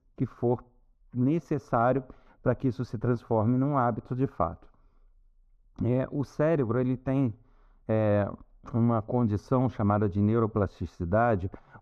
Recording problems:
muffled; very; fading above 1.5 kHz

